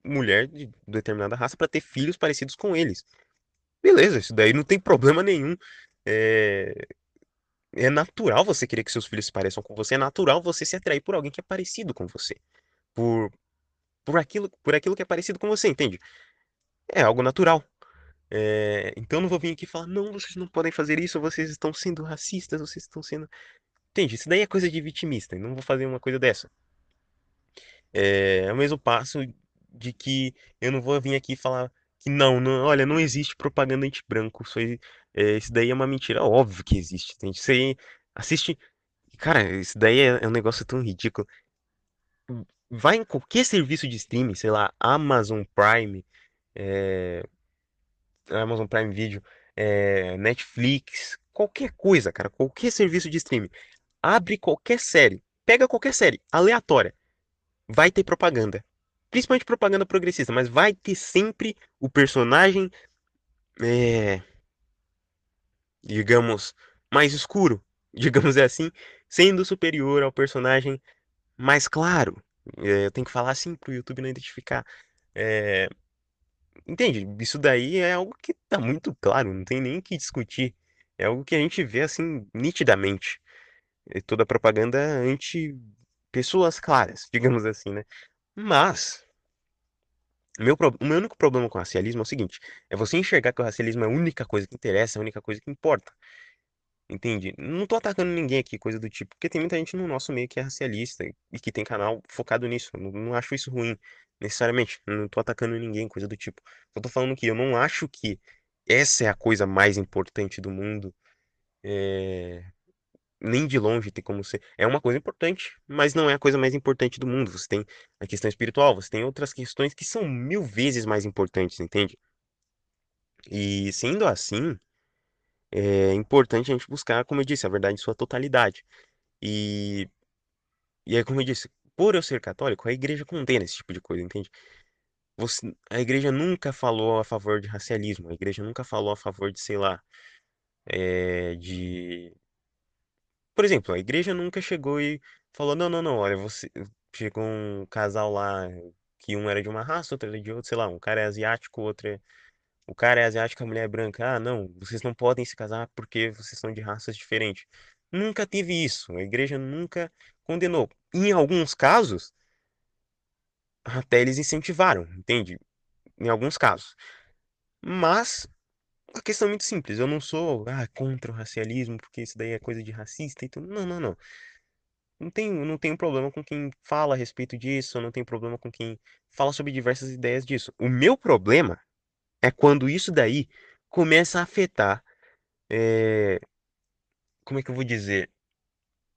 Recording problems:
garbled, watery; slightly; nothing above 13 kHz

